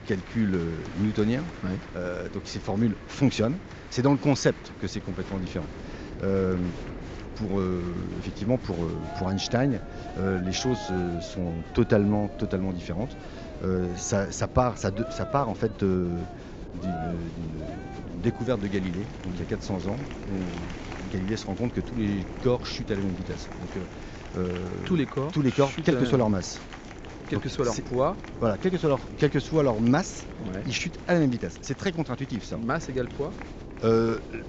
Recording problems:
high frequencies cut off; noticeable; nothing above 7.5 kHz
crowd noise; noticeable; throughout; 15 dB below the speech
wind noise on the microphone; occasional gusts; 15 dB below the speech

